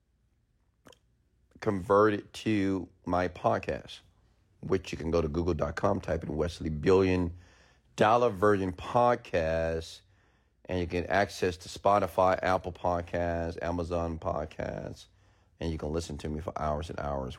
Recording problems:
none

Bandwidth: 16 kHz